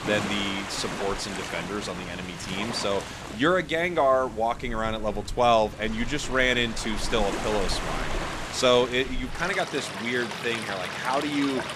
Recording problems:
rain or running water; loud; throughout; 8 dB below the speech

